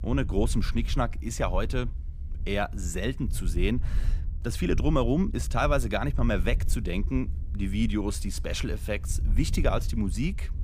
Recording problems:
low rumble; noticeable; throughout; 20 dB below the speech

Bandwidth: 15 kHz